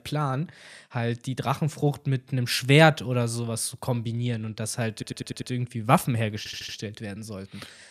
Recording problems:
audio stuttering; at 5 s and at 6.5 s

